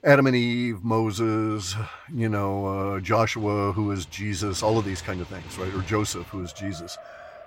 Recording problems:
traffic noise; noticeable; throughout; 20 dB below the speech

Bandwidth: 16 kHz